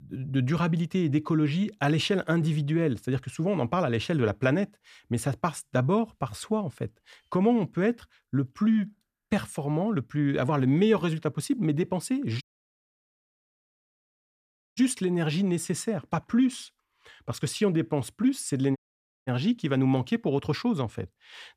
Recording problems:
audio cutting out; at 12 s for 2.5 s and at 19 s for 0.5 s

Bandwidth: 14.5 kHz